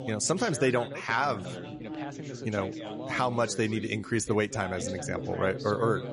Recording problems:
garbled, watery; slightly; nothing above 10.5 kHz
background chatter; loud; throughout; 3 voices, 9 dB below the speech

